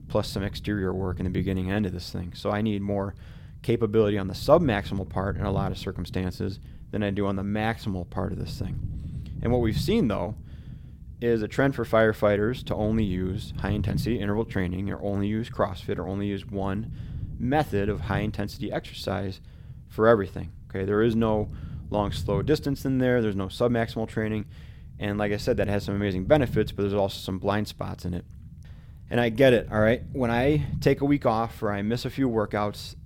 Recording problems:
low rumble; faint; throughout; 25 dB below the speech

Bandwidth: 16.5 kHz